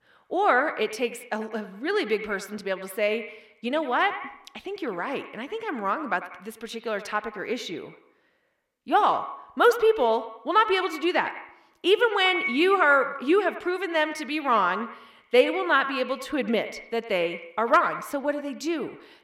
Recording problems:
echo of what is said; strong; throughout; 100 ms later, 10 dB below the speech

